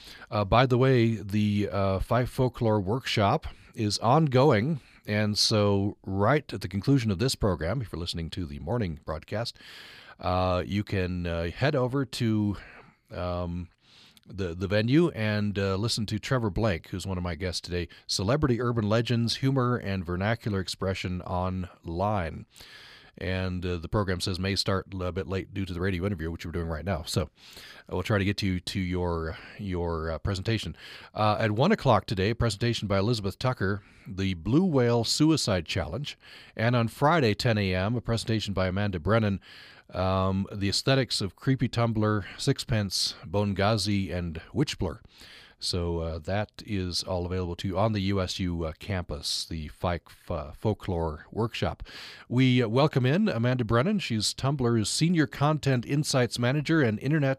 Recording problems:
none

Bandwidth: 15 kHz